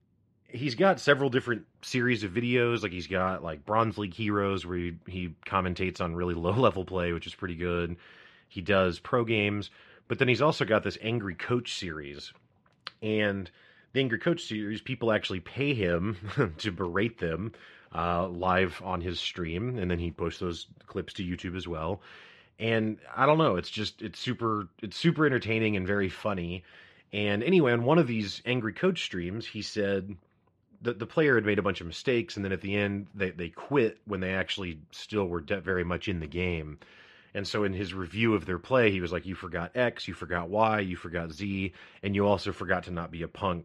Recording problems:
muffled; very slightly; fading above 3 kHz

